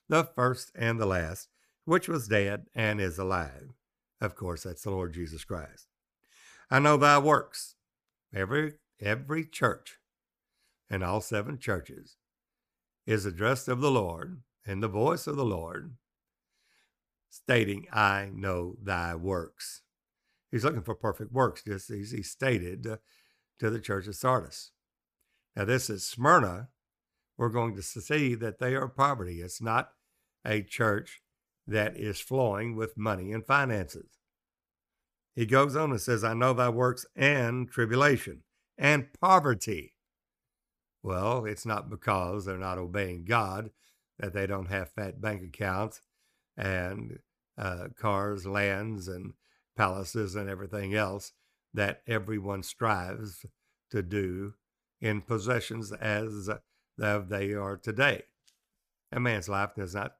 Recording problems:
none

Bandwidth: 15 kHz